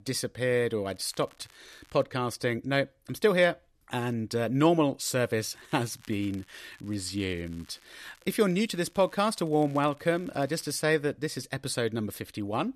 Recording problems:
crackling; faint; from 1 to 2 s and from 5.5 to 11 s; 30 dB below the speech

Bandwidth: 13.5 kHz